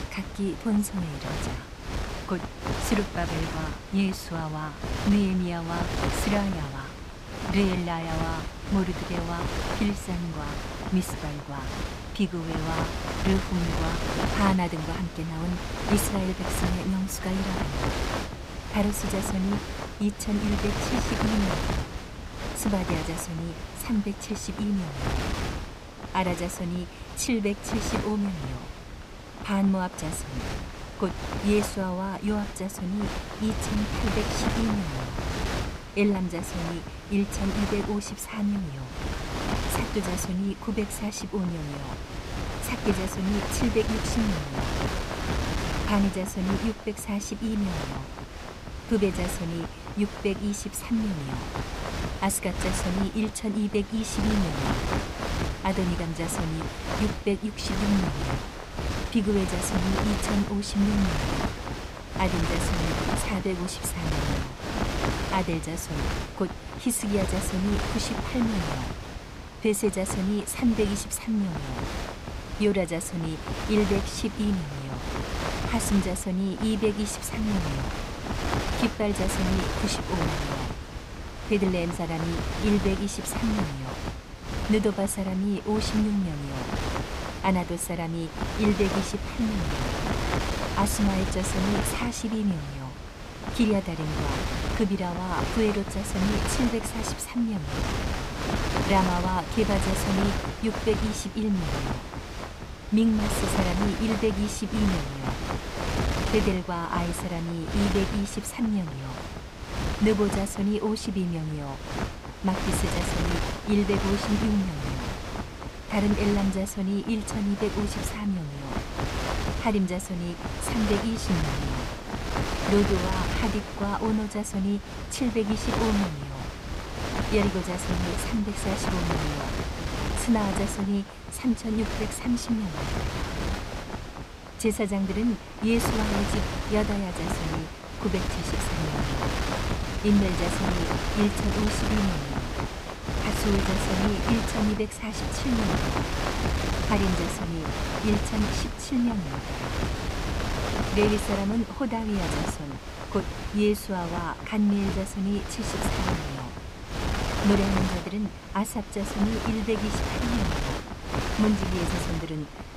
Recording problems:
wind noise on the microphone; heavy; 1 dB below the speech

